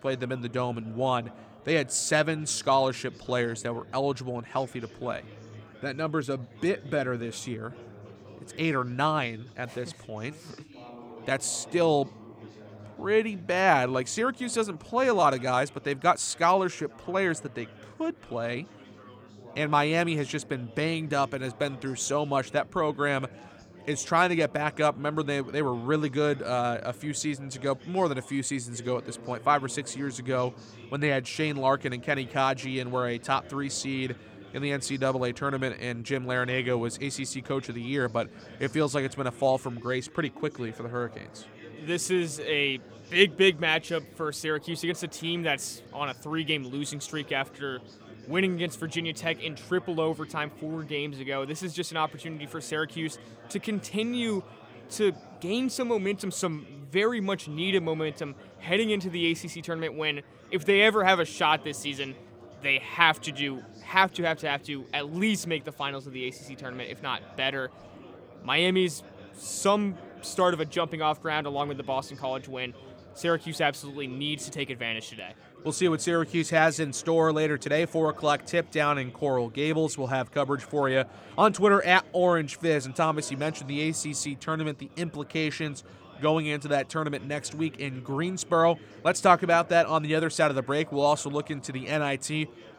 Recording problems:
chatter from many people; faint; throughout; 20 dB below the speech

